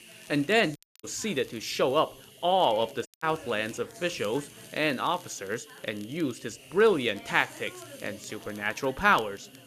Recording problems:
background chatter; faint; throughout; 4 voices, 25 dB below the speech
hiss; faint; throughout; 20 dB below the speech
crackle, like an old record; faint; 25 dB below the speech
audio cutting out; at 1 s and at 3 s

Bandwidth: 14.5 kHz